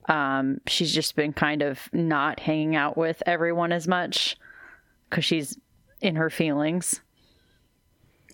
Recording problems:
squashed, flat; somewhat

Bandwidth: 17 kHz